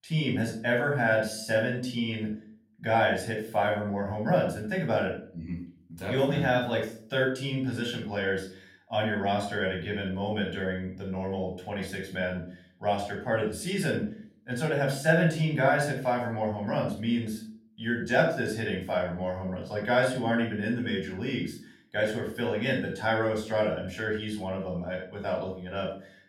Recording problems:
off-mic speech; far
room echo; noticeable; dies away in 0.4 s

